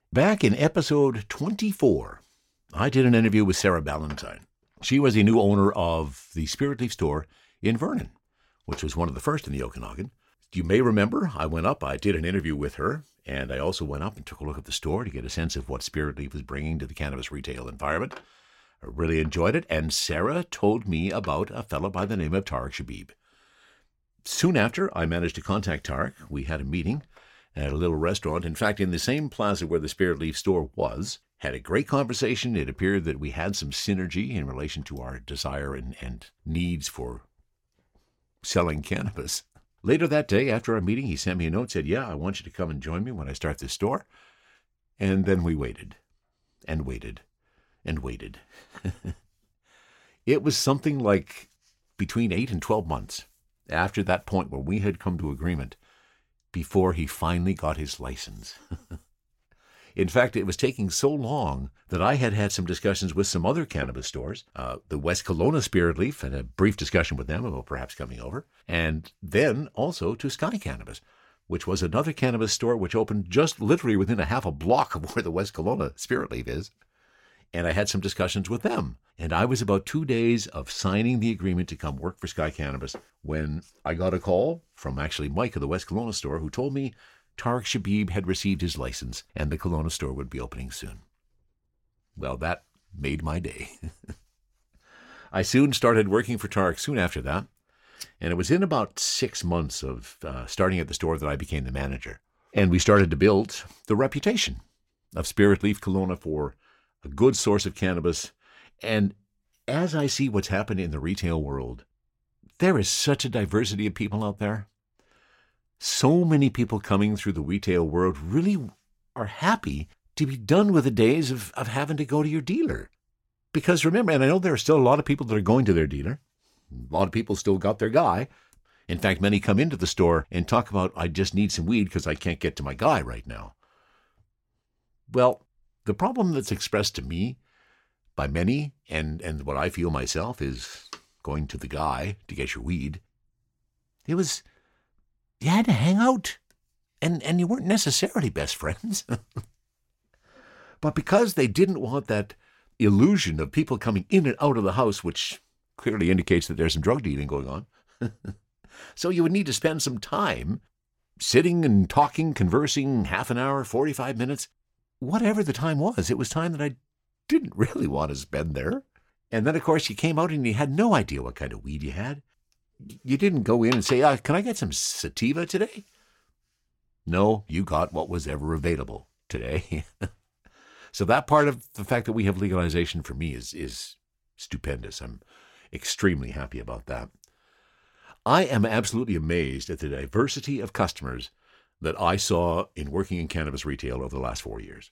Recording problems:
none

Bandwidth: 16.5 kHz